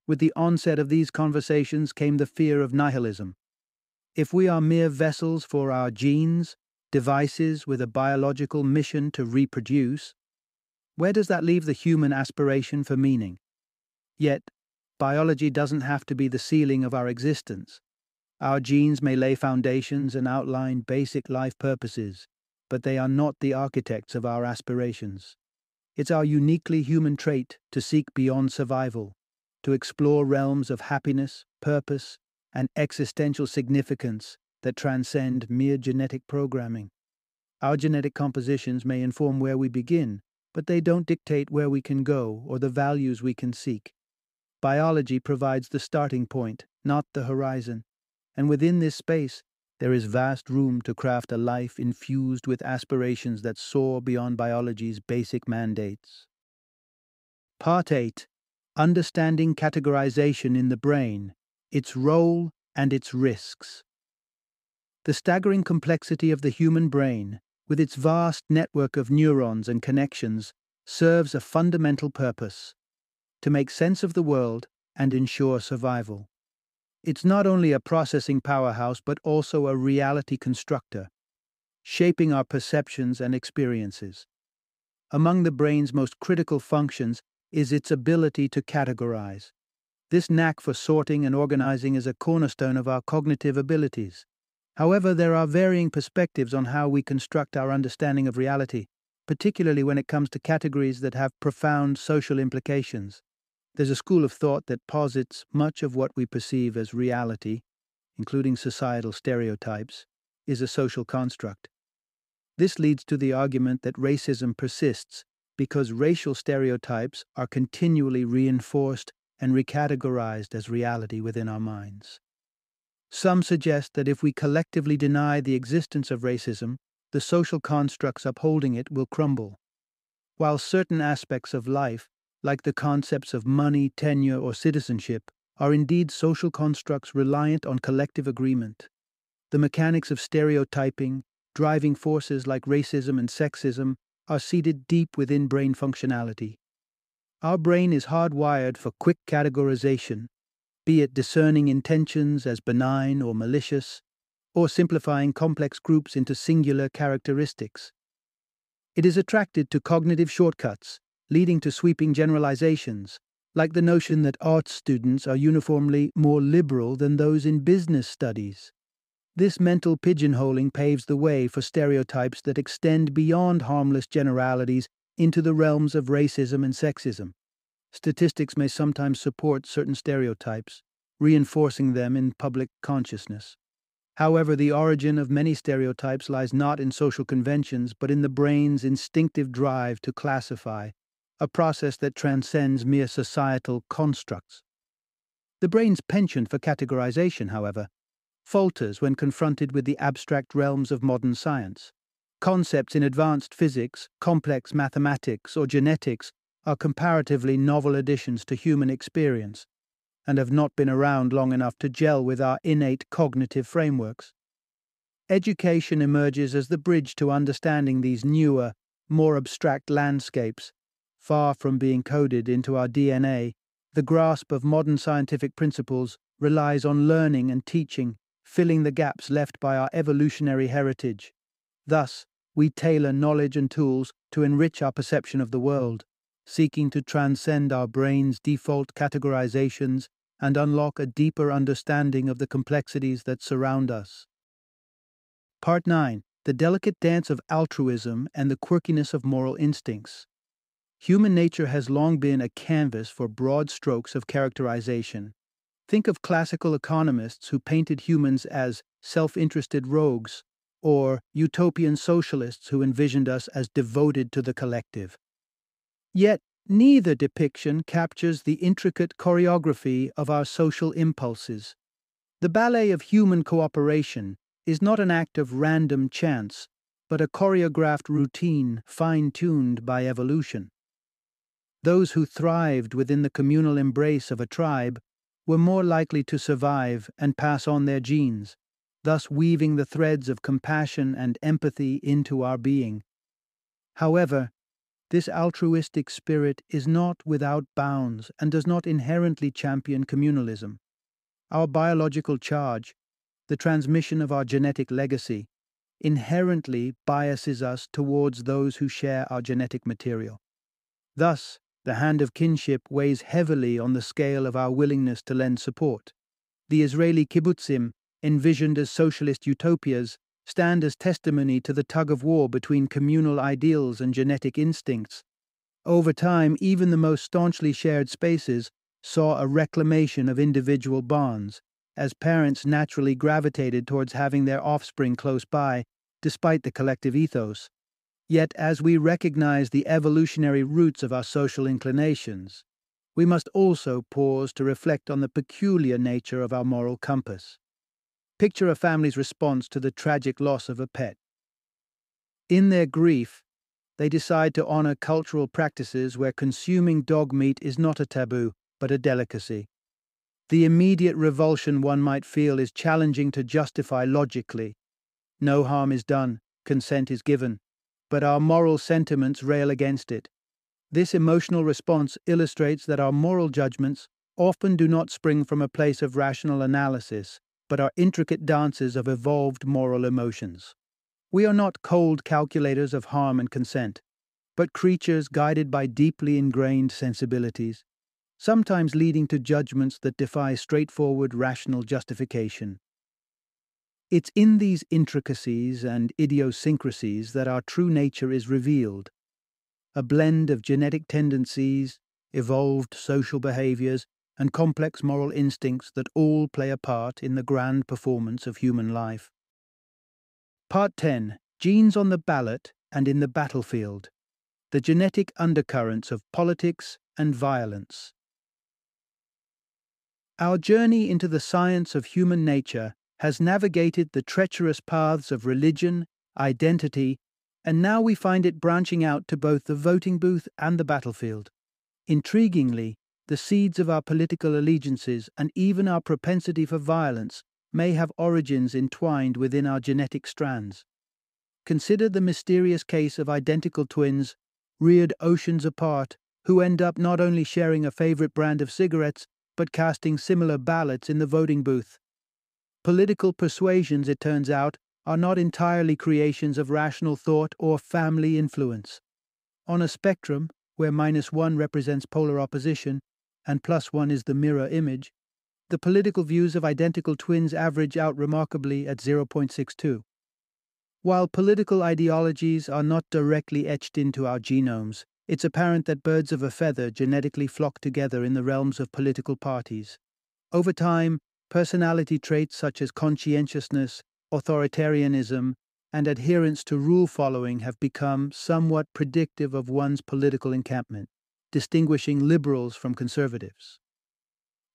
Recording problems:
none

